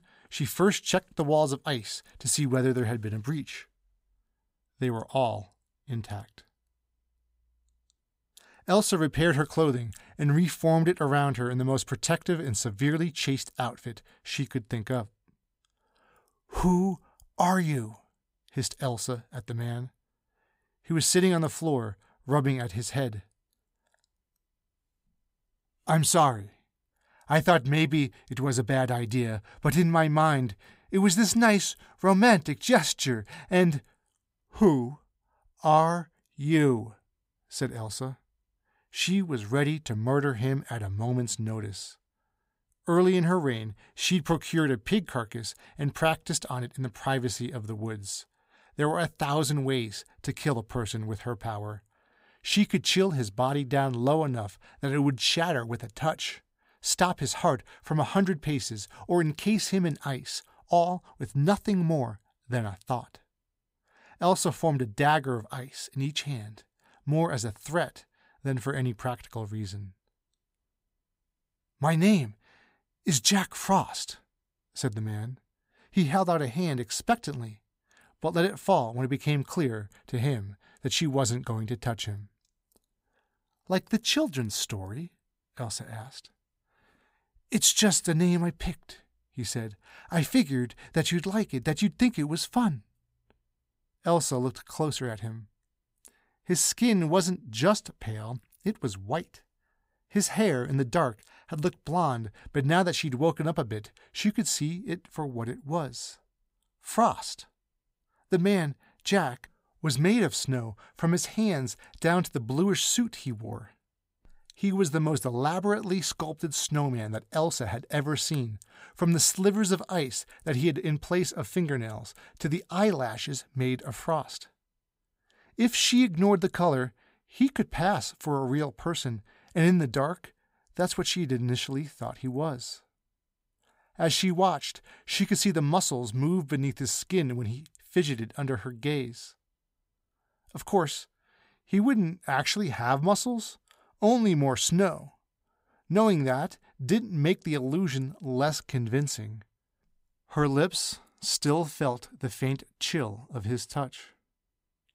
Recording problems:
none

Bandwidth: 15.5 kHz